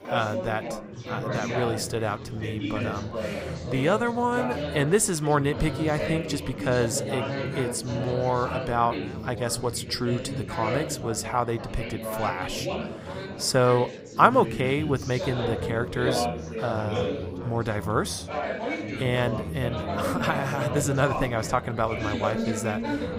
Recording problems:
chatter from many people; loud; throughout; 5 dB below the speech

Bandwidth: 15.5 kHz